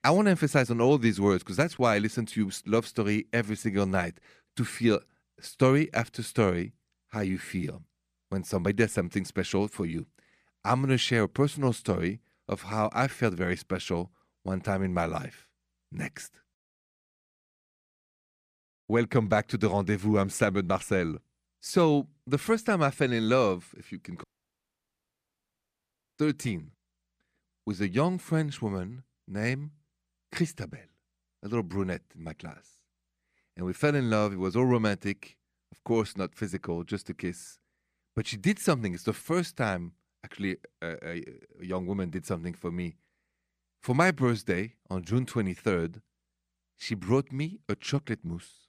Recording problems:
audio cutting out; at 24 s for 2 s

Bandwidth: 14.5 kHz